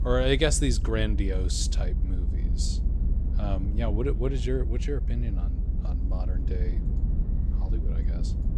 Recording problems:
low rumble; noticeable; throughout; 15 dB below the speech

